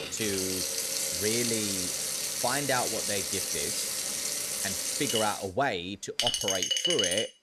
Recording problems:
household noises; very loud; throughout; 4 dB above the speech

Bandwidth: 15.5 kHz